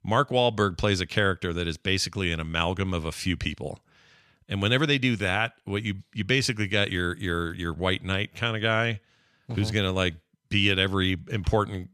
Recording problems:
none

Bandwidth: 14 kHz